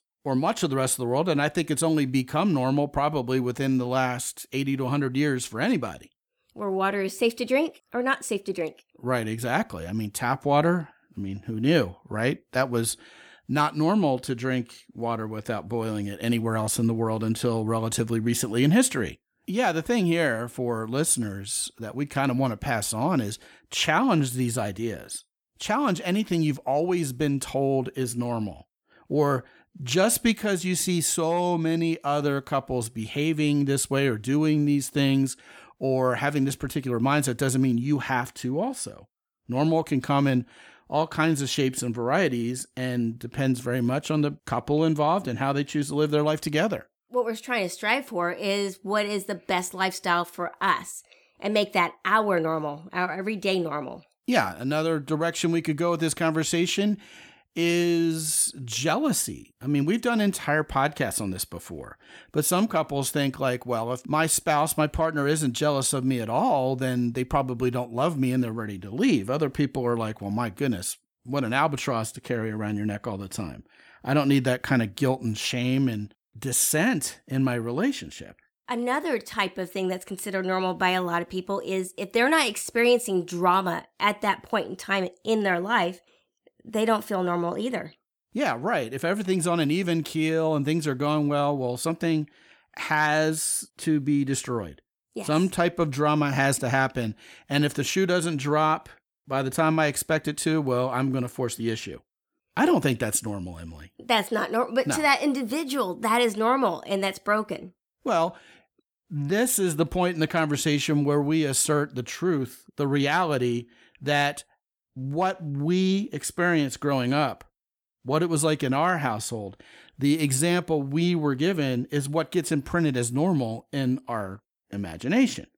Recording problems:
none

